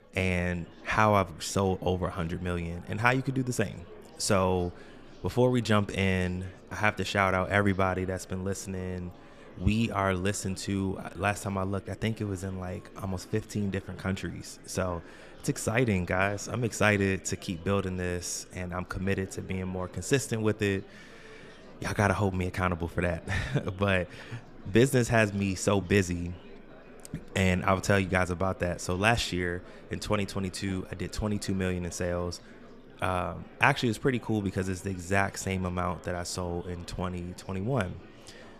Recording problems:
chatter from many people; faint; throughout; 20 dB below the speech

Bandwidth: 14.5 kHz